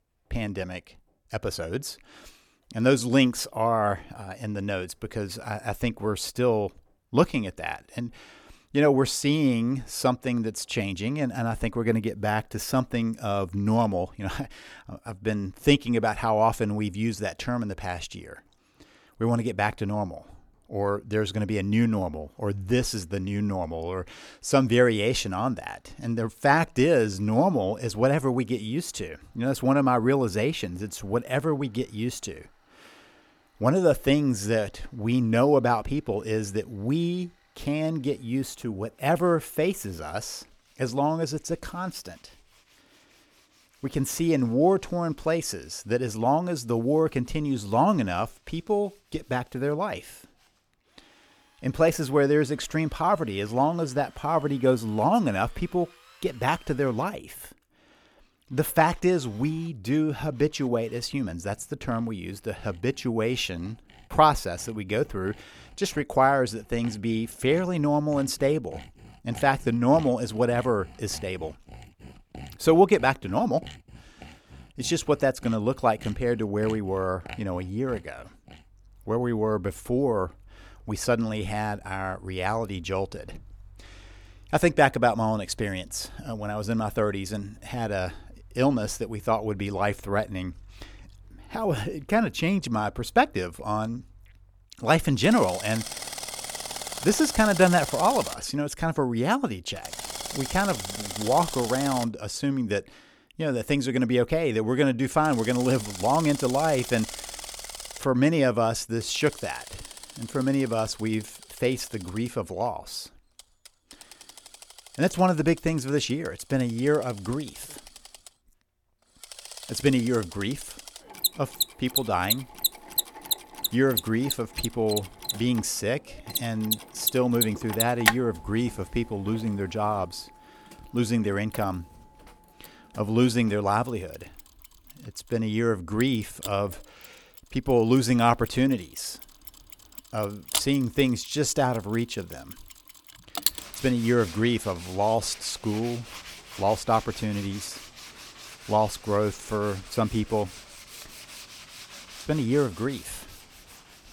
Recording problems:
machinery noise; loud; throughout; 9 dB below the speech

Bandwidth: 18.5 kHz